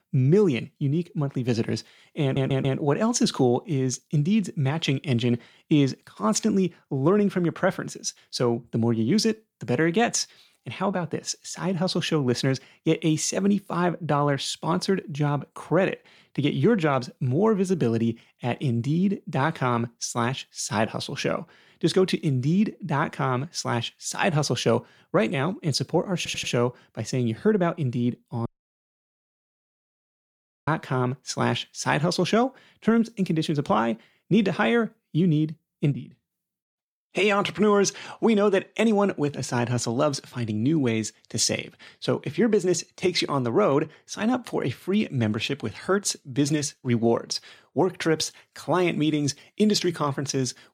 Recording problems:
audio stuttering; at 2 s and at 26 s
audio cutting out; at 28 s for 2 s

